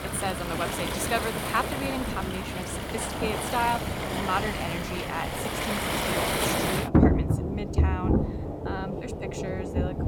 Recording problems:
rain or running water; very loud; throughout; 5 dB above the speech

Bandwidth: 18 kHz